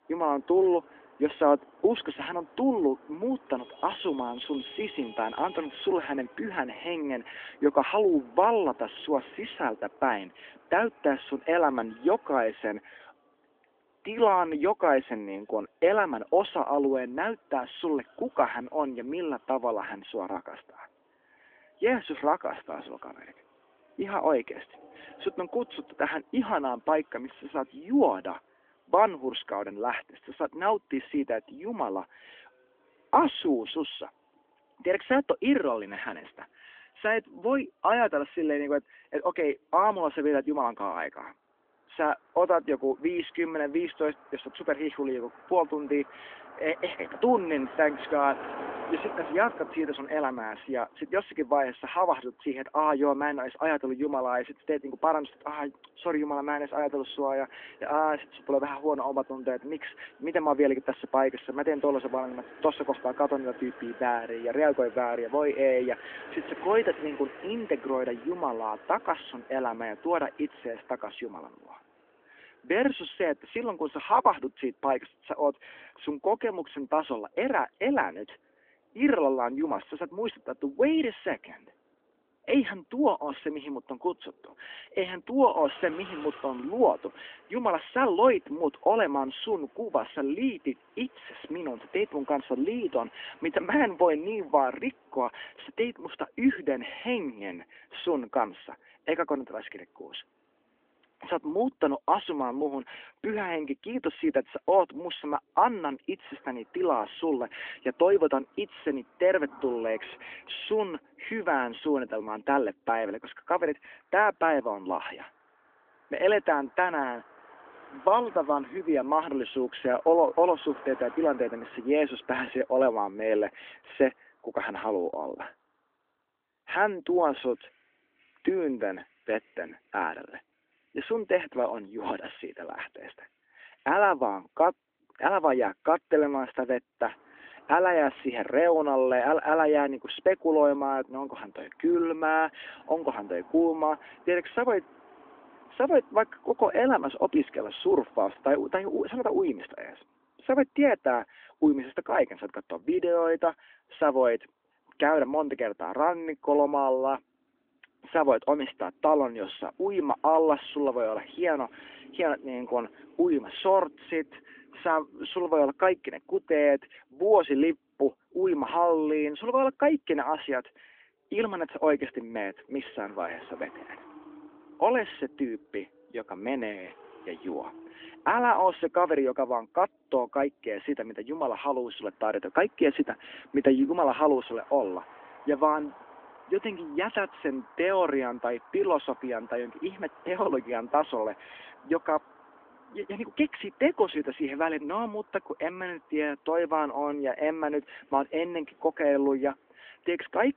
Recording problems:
phone-call audio; nothing above 3.5 kHz
traffic noise; faint; throughout; 20 dB below the speech

